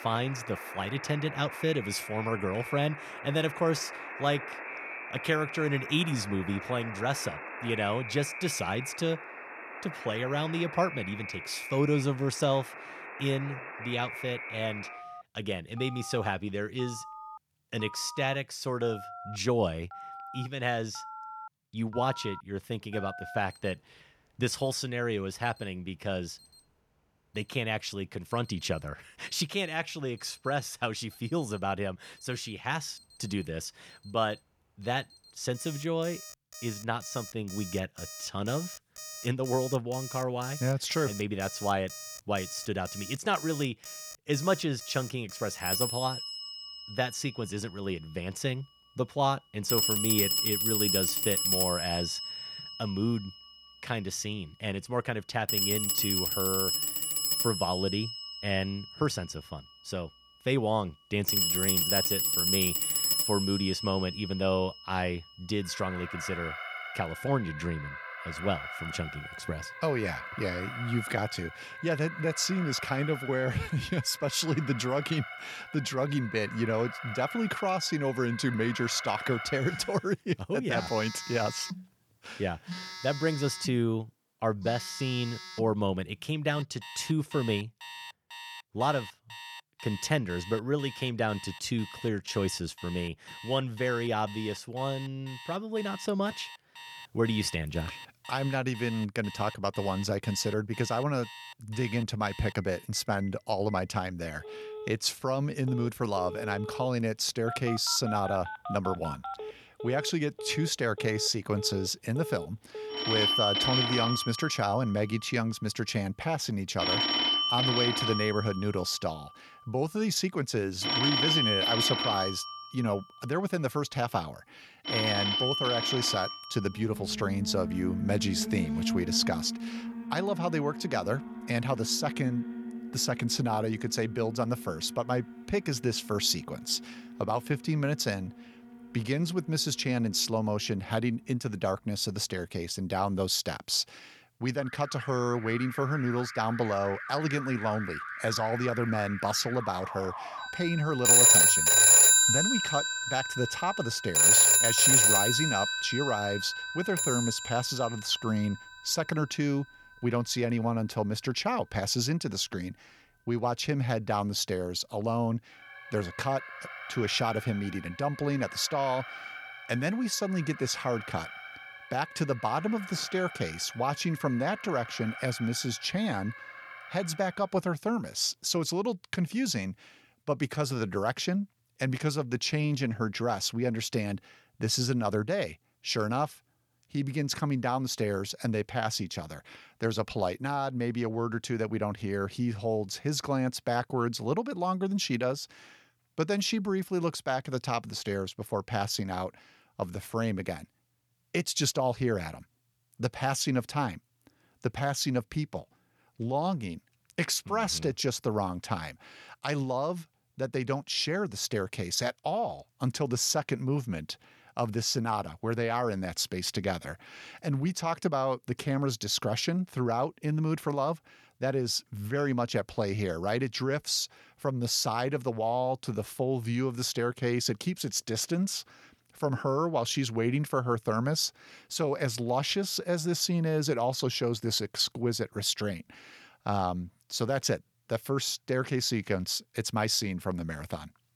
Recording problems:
alarms or sirens; very loud; until 2:57; 2 dB above the speech

